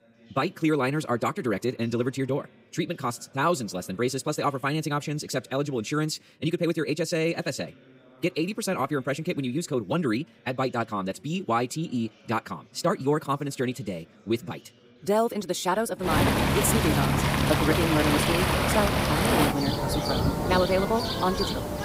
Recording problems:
wrong speed, natural pitch; too fast; 1.6 times normal speed
rain or running water; very loud; from 16 s on; 3 dB above the speech
background chatter; faint; throughout; 4 voices, 30 dB below the speech

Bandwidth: 15.5 kHz